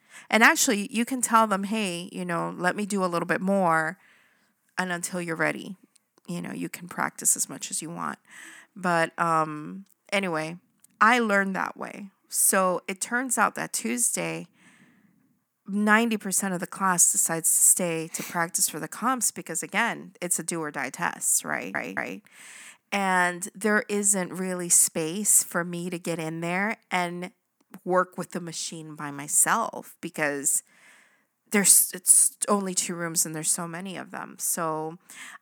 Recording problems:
audio stuttering; at 22 s

